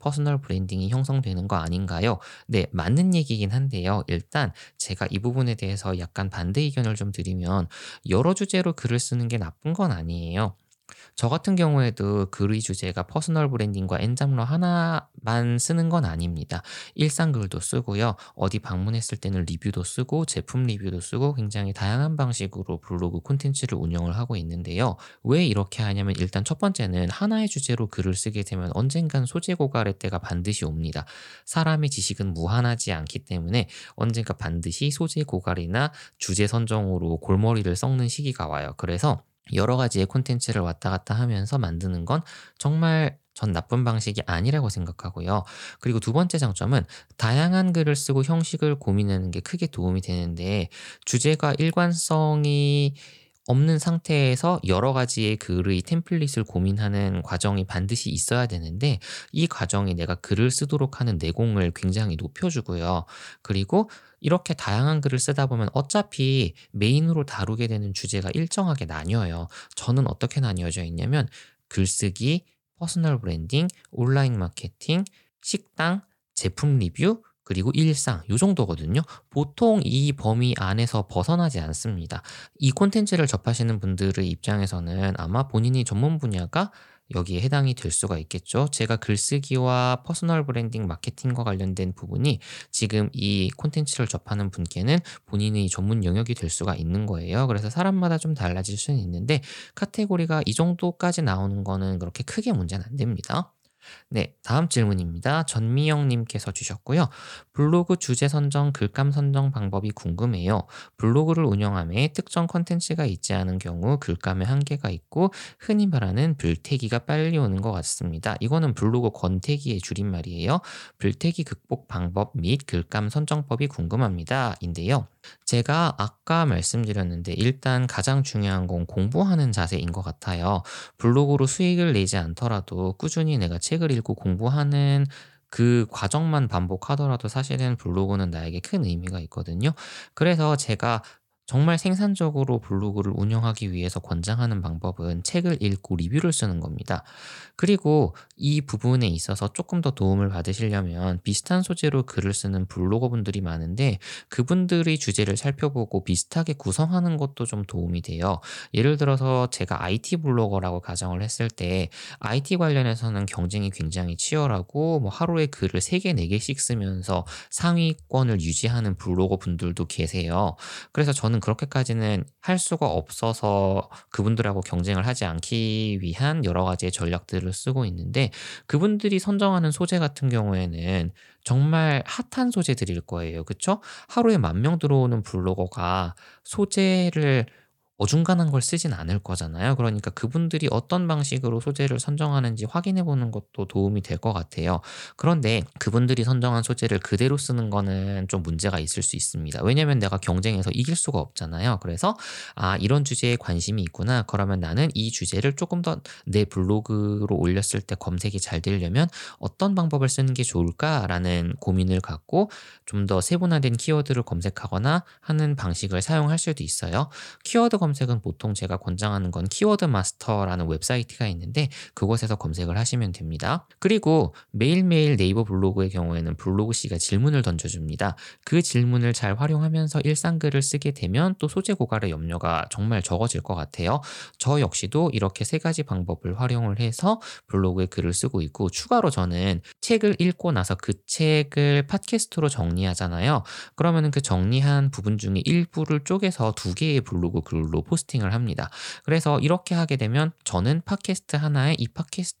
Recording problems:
none

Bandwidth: 18 kHz